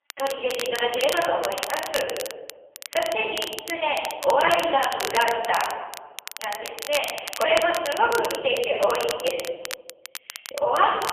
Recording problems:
phone-call audio; poor line; nothing above 3.5 kHz
off-mic speech; far
thin; very; fading below 450 Hz
room echo; noticeable; dies away in 1 s
crackle, like an old record; noticeable; 10 dB below the speech

